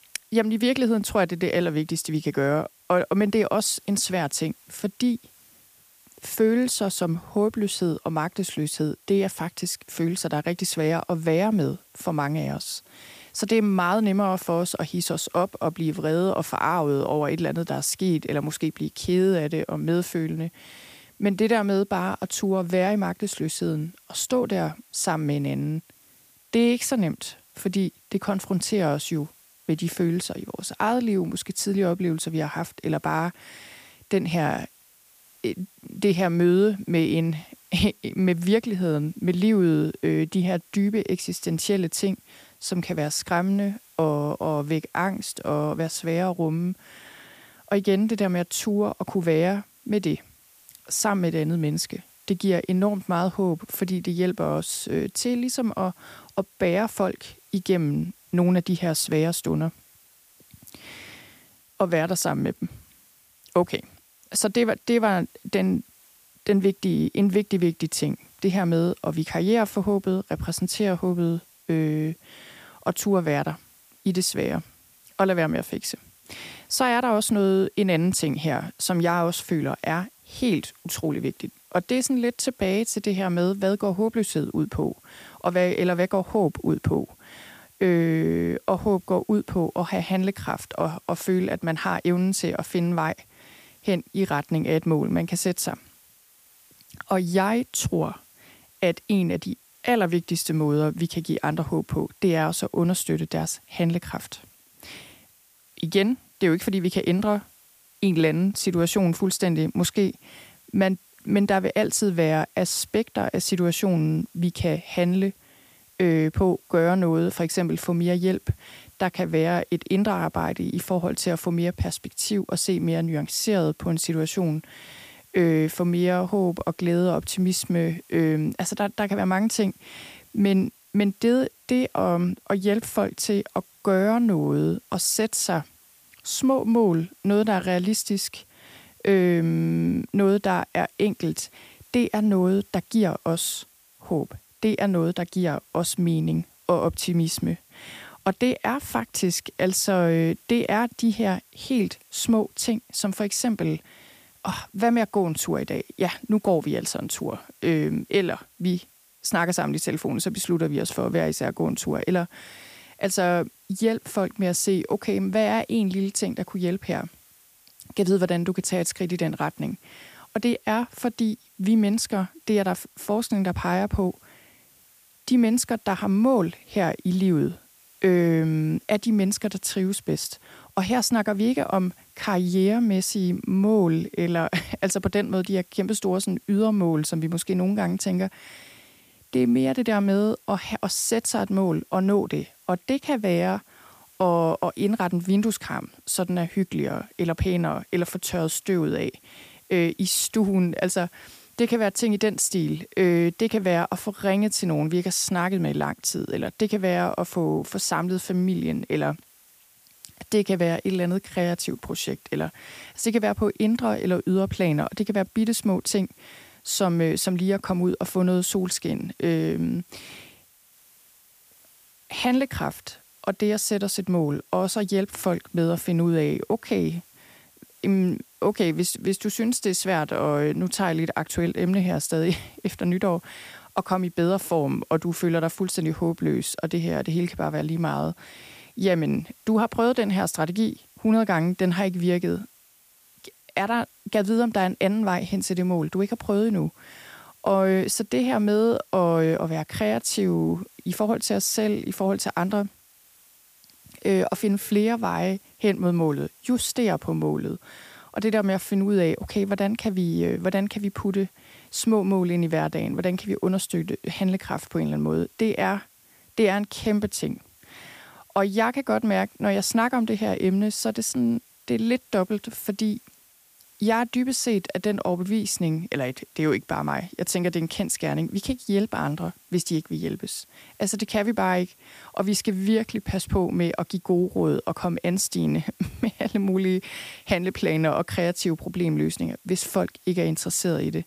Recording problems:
hiss; faint; throughout; 30 dB below the speech

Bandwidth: 15 kHz